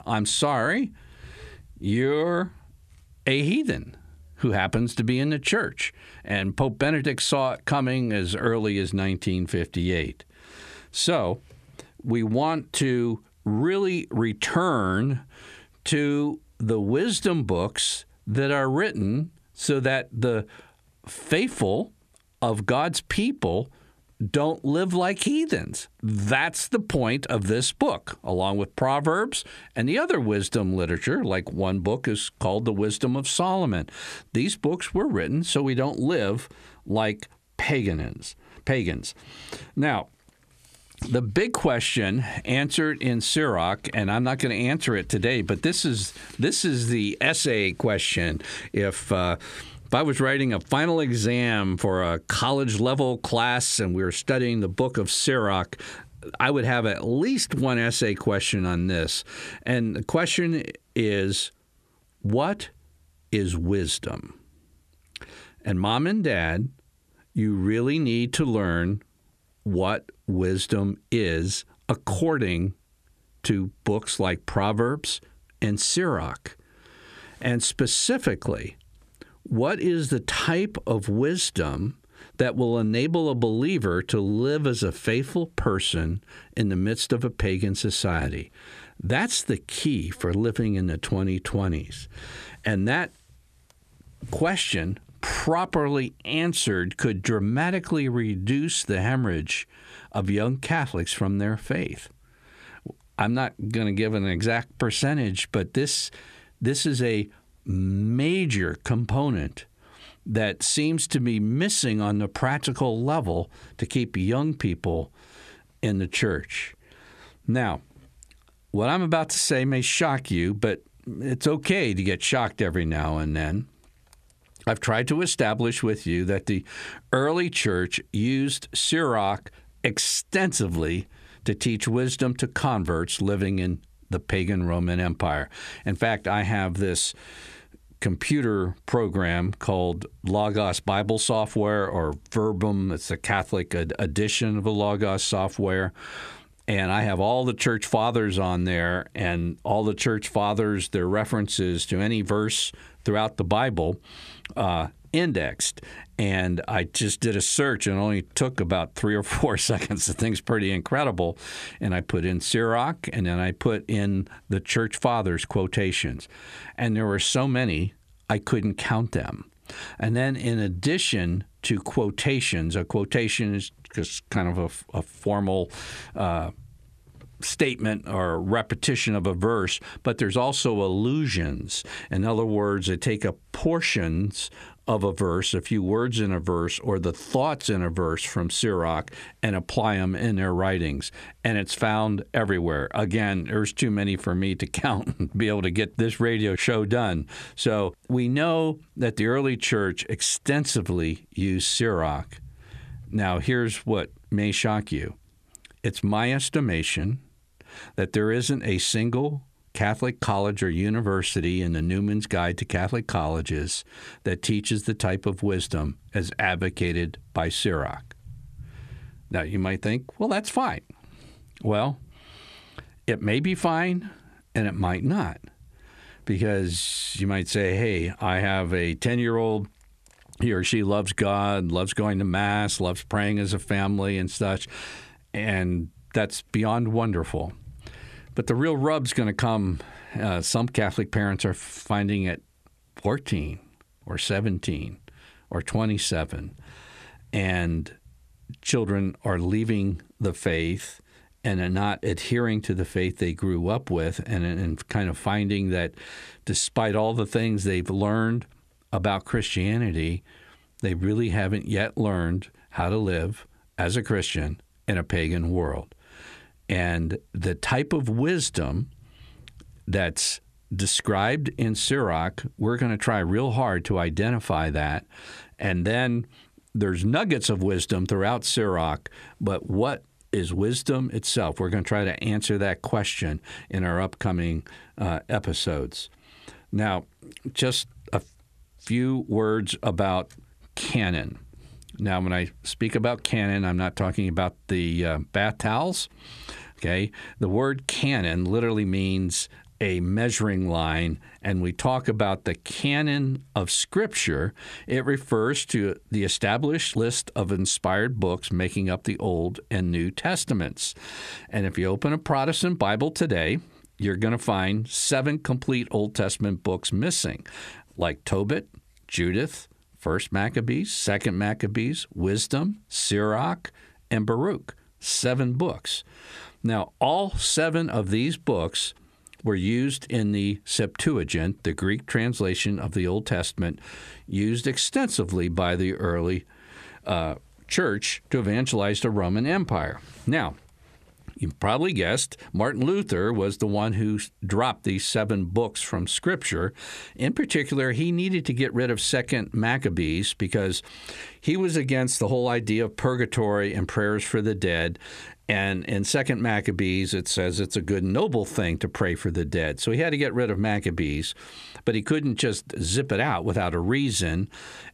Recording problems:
squashed, flat; heavily

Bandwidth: 14.5 kHz